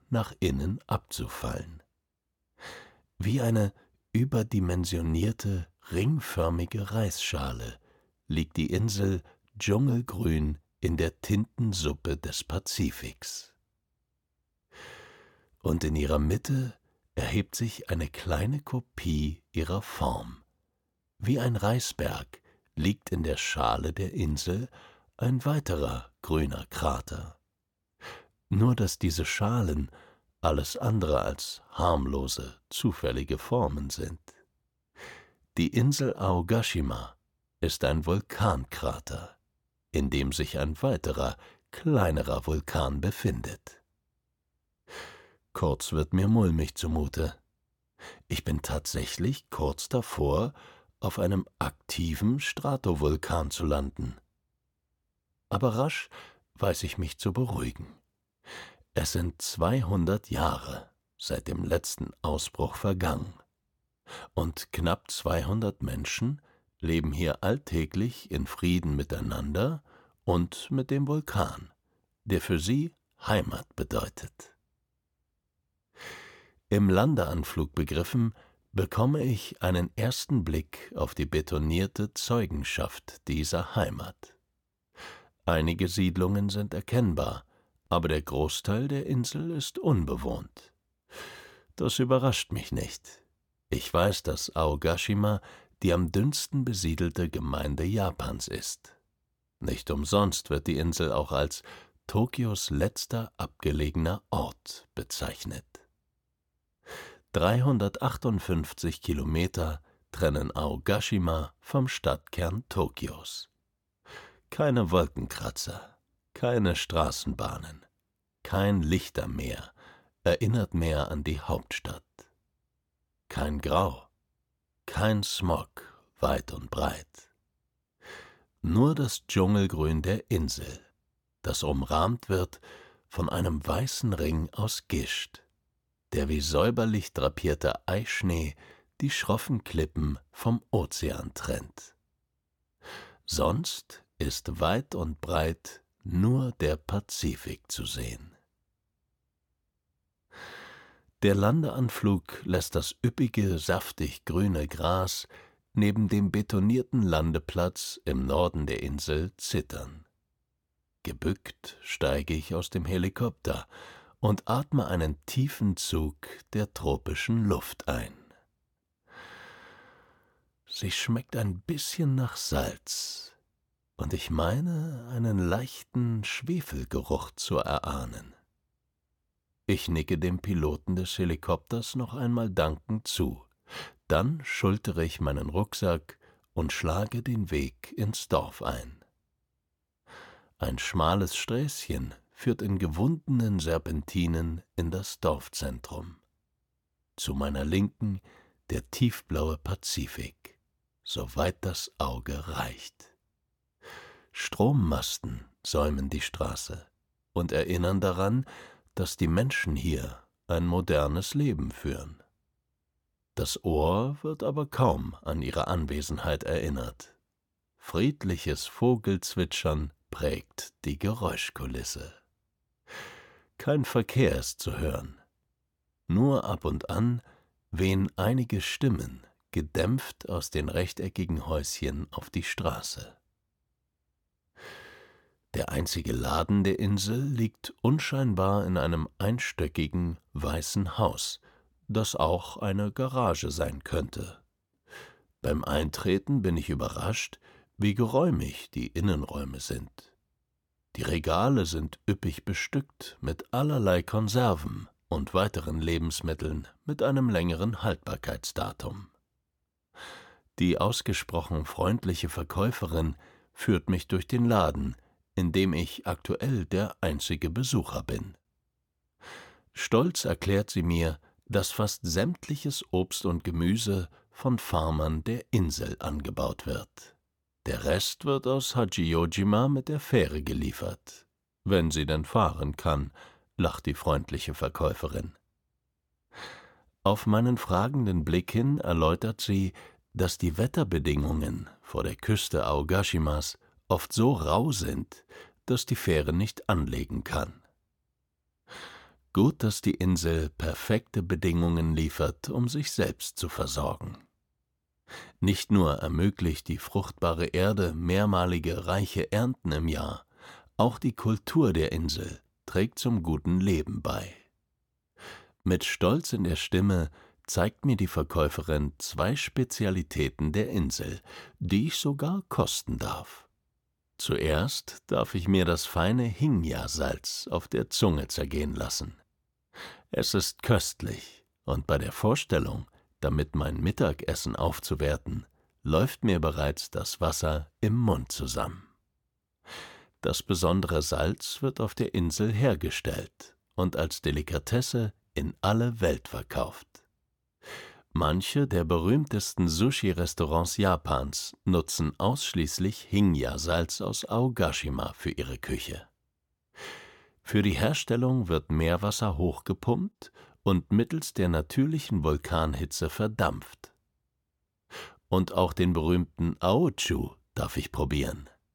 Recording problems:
none

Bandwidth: 17.5 kHz